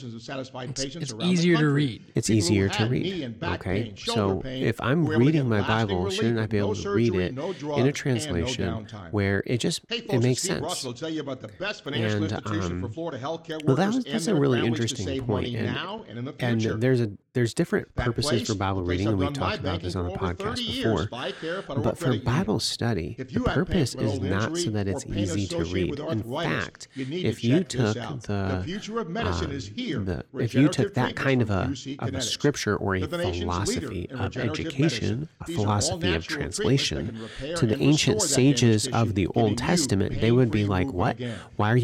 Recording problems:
voice in the background; loud; throughout; 6 dB below the speech
abrupt cut into speech; at the end

